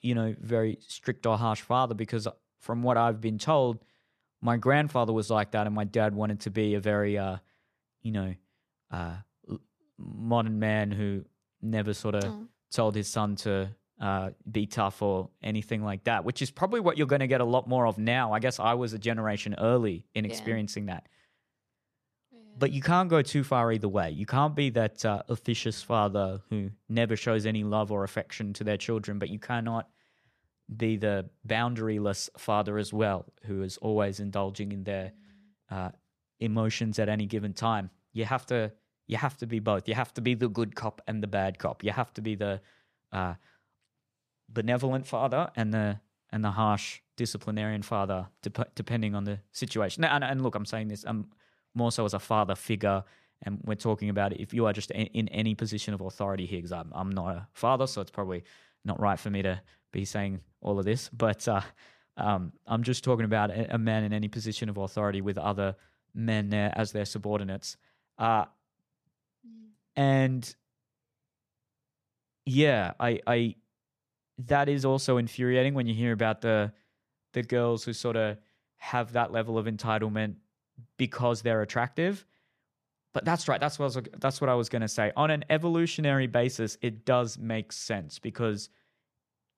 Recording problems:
none

